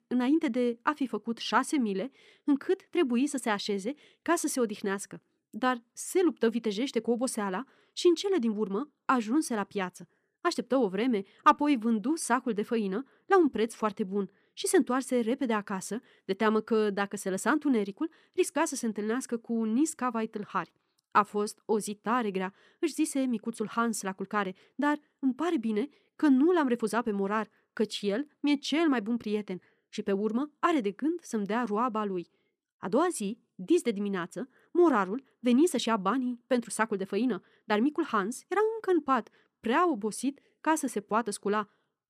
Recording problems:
wrong speed, natural pitch; too fast; 1.5 times normal speed

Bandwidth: 14.5 kHz